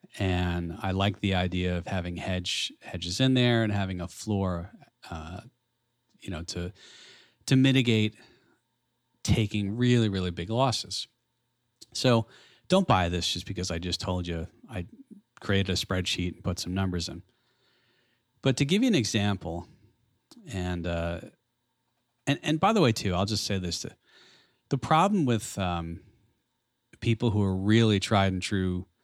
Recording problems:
none

